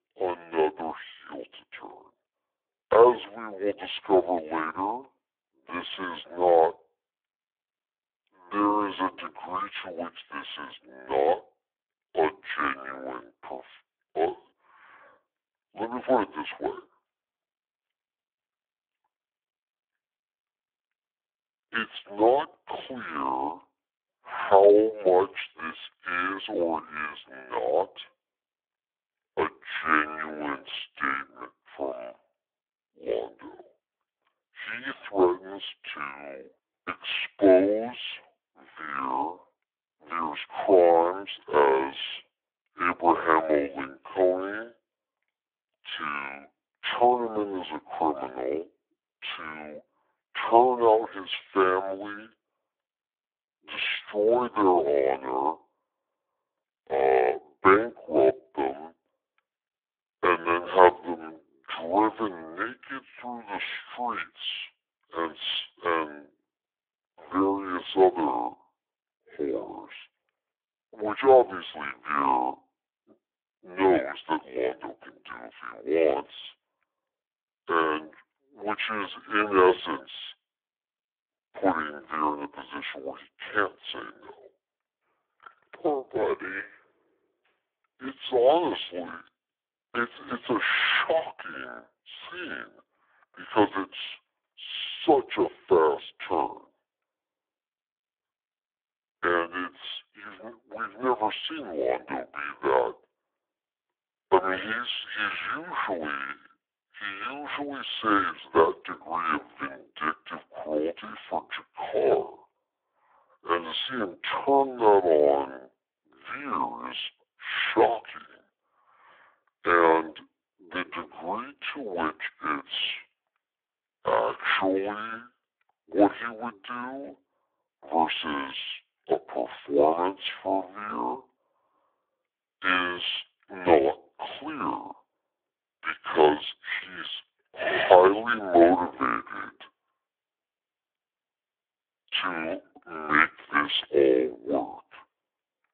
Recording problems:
phone-call audio; poor line; nothing above 3.5 kHz
wrong speed and pitch; too slow and too low; 0.6 times normal speed

